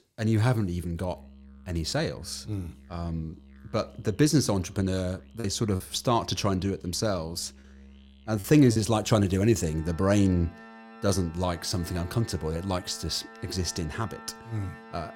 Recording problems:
background music; faint; throughout; 20 dB below the speech
choppy; occasionally; at 5.5 s and at 8.5 s; 4% of the speech affected

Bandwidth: 16.5 kHz